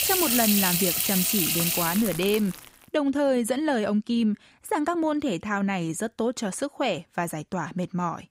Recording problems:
household noises; very loud; until 2.5 s; 3 dB above the speech

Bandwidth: 15.5 kHz